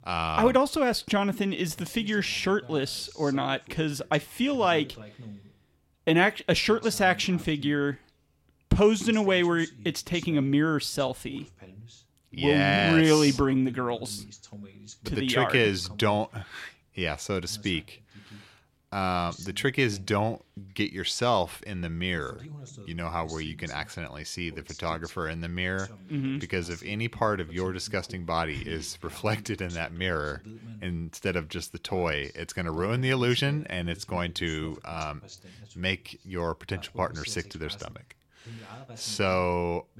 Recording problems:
voice in the background; noticeable; throughout; 20 dB below the speech

